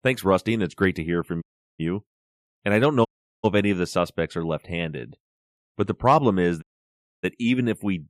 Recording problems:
audio cutting out; at 1.5 s, at 3 s and at 6.5 s for 0.5 s

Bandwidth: 14.5 kHz